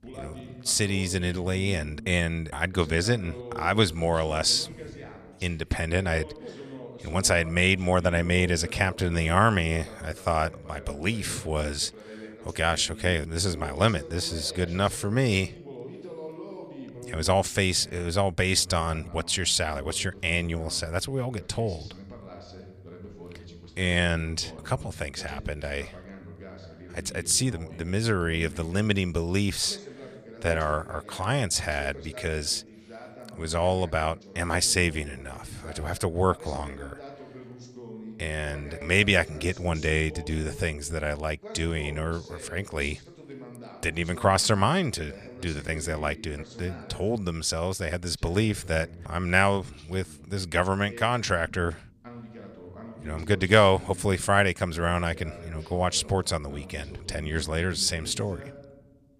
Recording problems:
voice in the background; noticeable; throughout; 20 dB below the speech

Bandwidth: 15 kHz